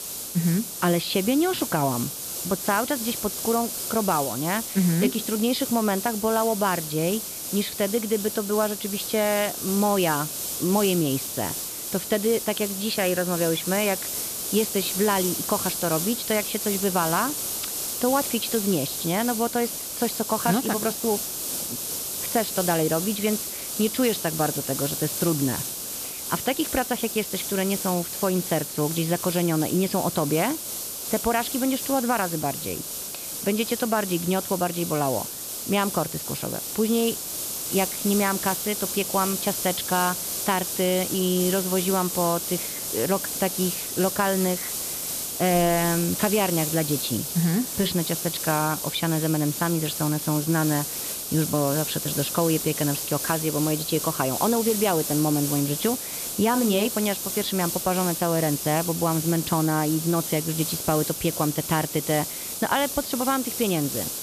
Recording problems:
high frequencies cut off; noticeable; nothing above 5.5 kHz
hiss; loud; throughout; 3 dB below the speech

